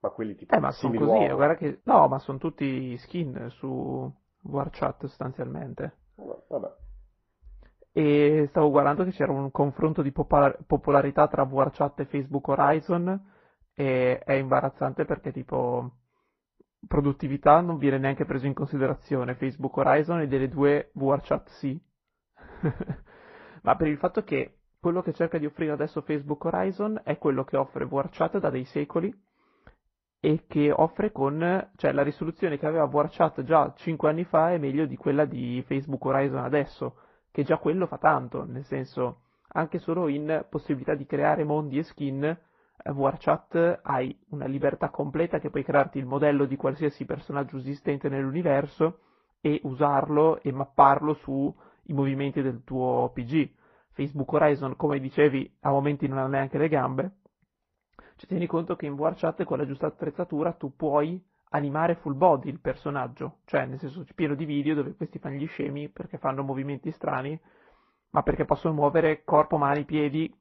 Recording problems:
muffled; very; fading above 3 kHz
garbled, watery; slightly

